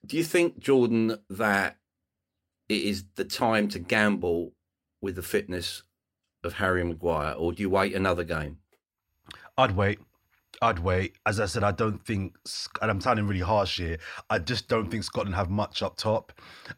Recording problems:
none

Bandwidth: 16 kHz